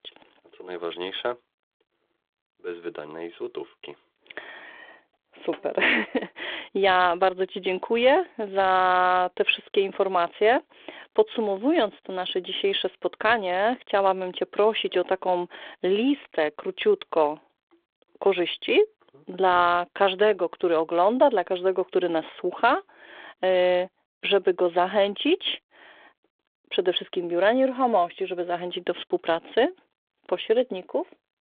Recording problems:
phone-call audio

